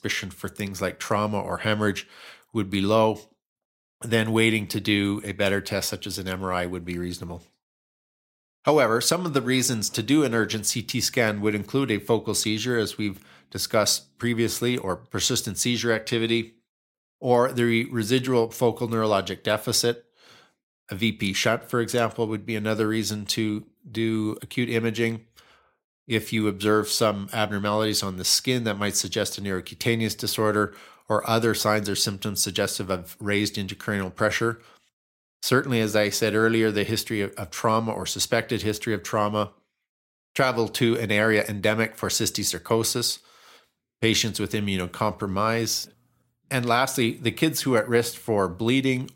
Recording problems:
none

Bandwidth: 16 kHz